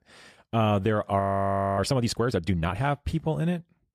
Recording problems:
audio freezing; at 1 s for 0.5 s

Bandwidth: 14.5 kHz